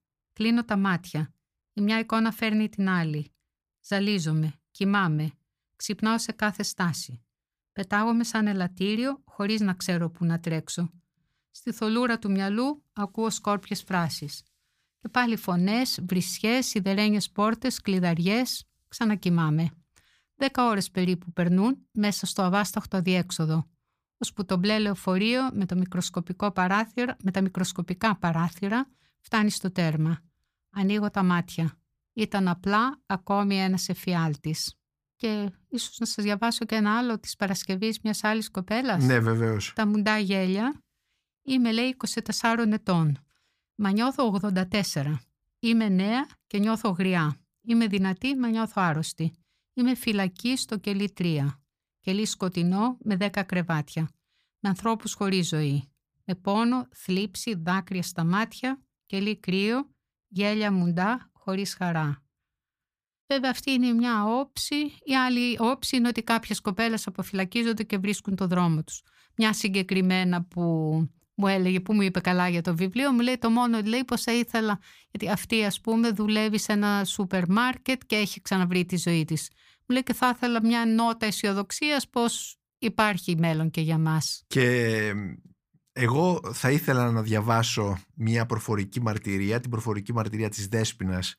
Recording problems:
none

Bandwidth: 15 kHz